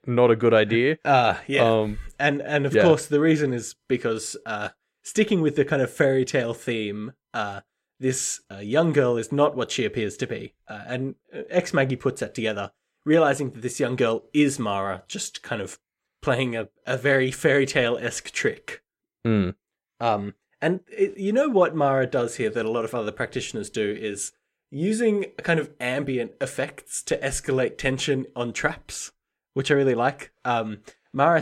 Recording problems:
abrupt cut into speech; at the end

